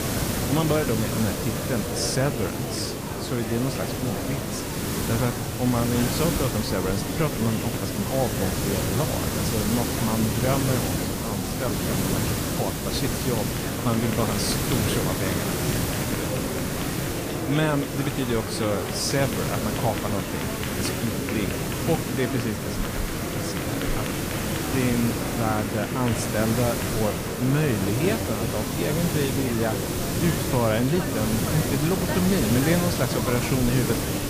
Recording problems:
garbled, watery; slightly; nothing above 14.5 kHz
murmuring crowd; loud; throughout; 5 dB below the speech
hiss; loud; throughout; 1 dB below the speech

